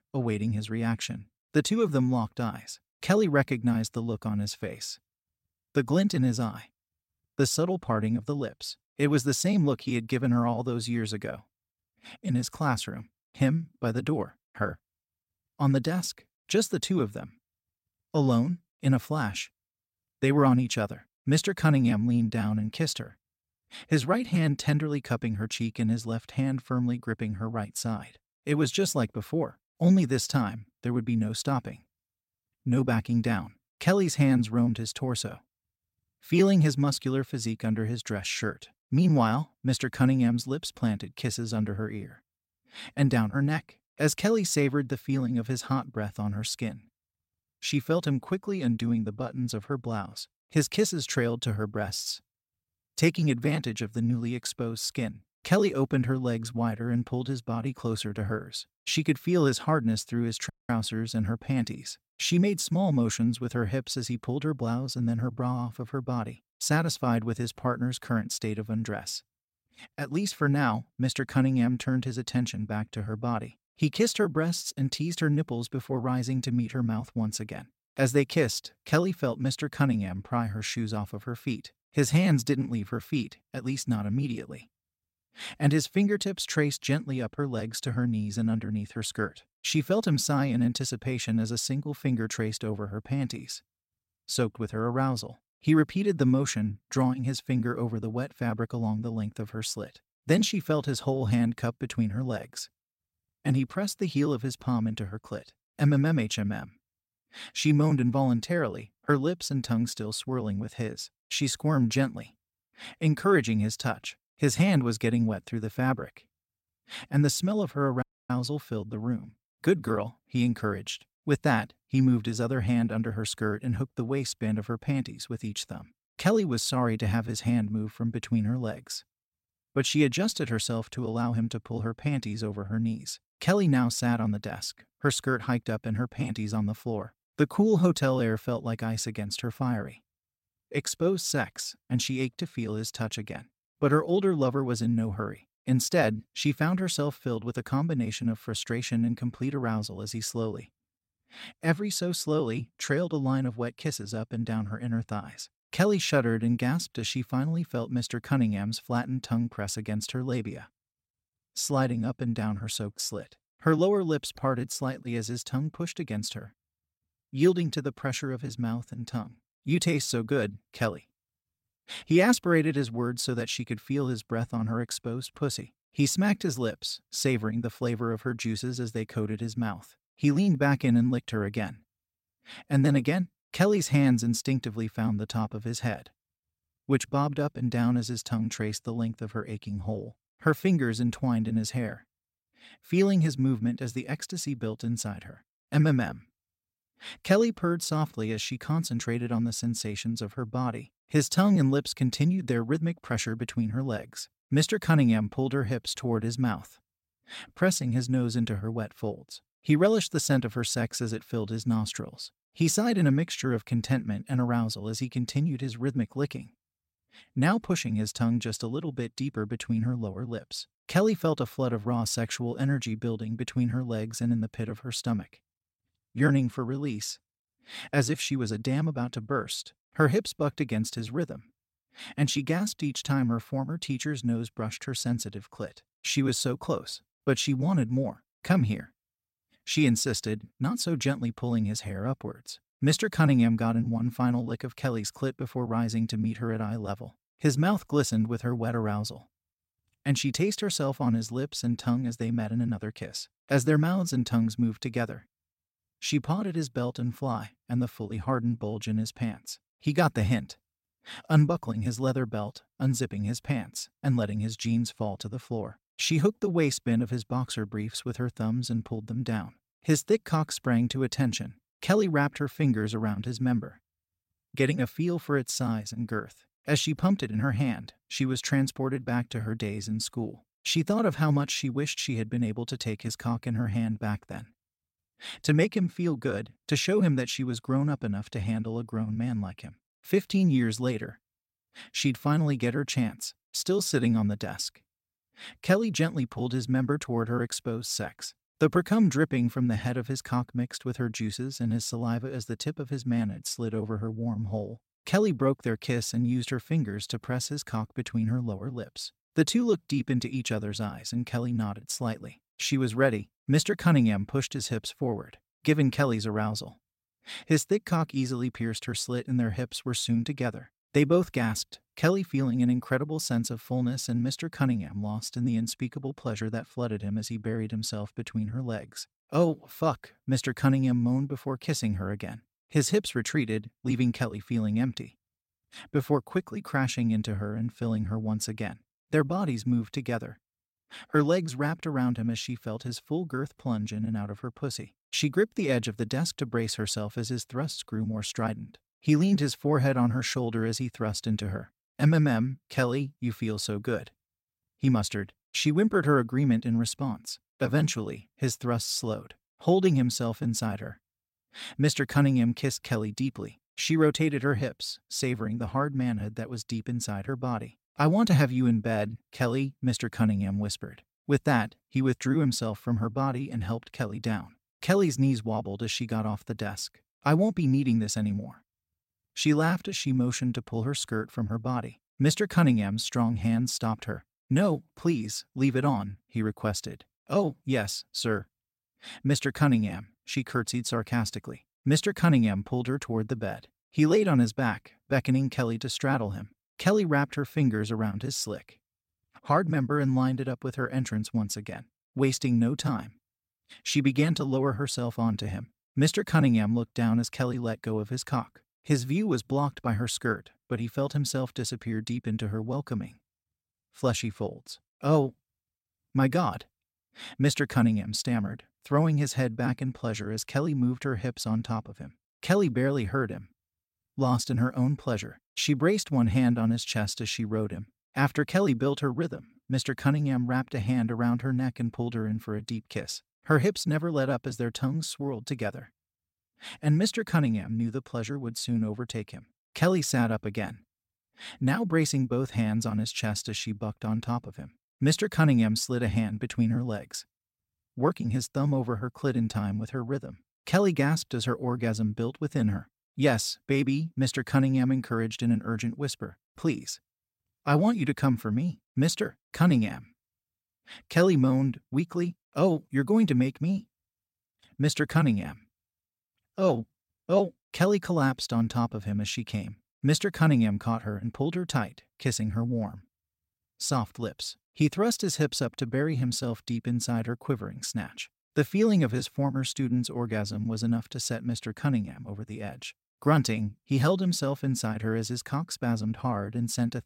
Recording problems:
audio cutting out; at 1:01 and at 1:58

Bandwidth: 16 kHz